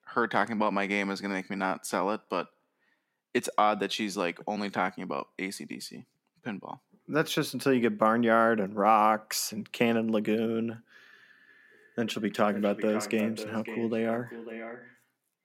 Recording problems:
echo of what is said; noticeable; from 11 s on; 550 ms later, 10 dB below the speech

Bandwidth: 16.5 kHz